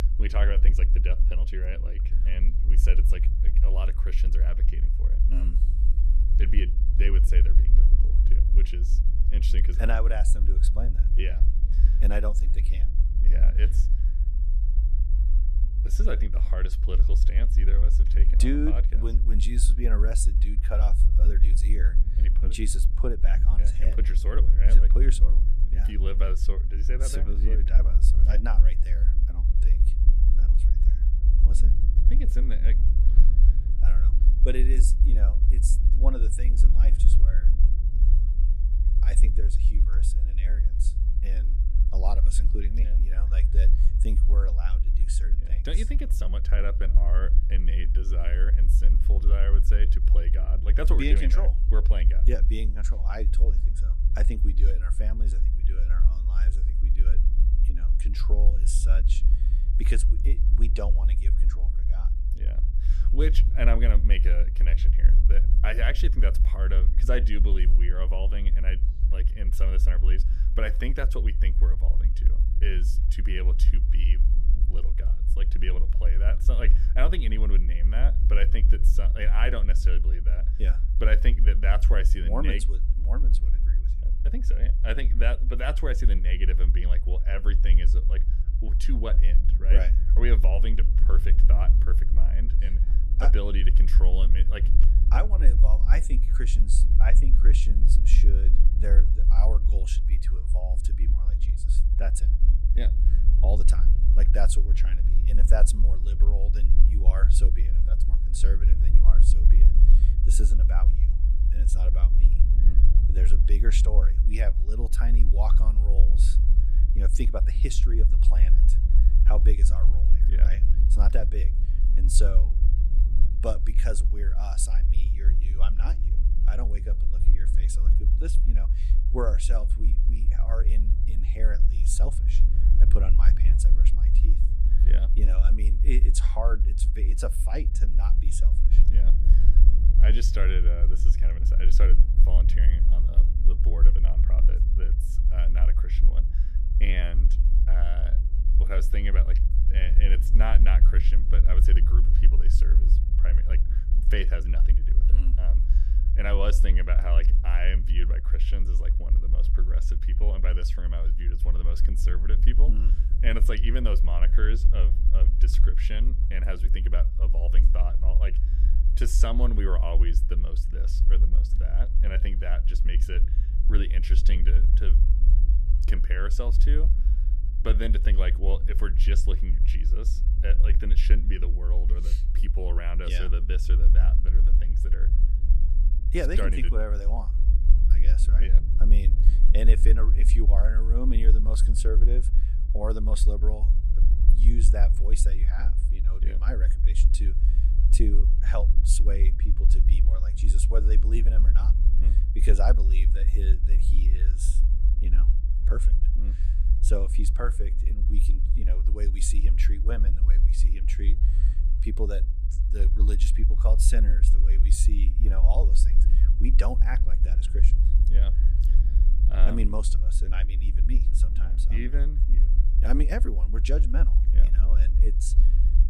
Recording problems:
low rumble; loud; throughout; 8 dB below the speech

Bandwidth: 14.5 kHz